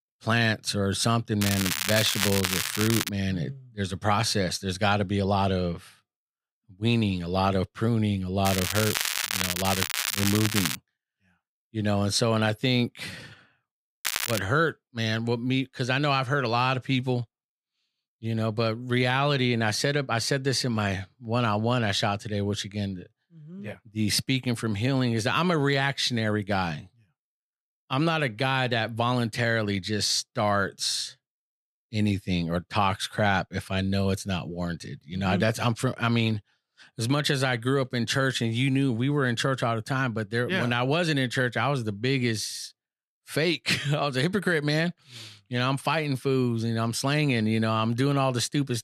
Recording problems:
crackling; loud; from 1.5 to 3 s, from 8.5 to 11 s and at 14 s; 1 dB below the speech

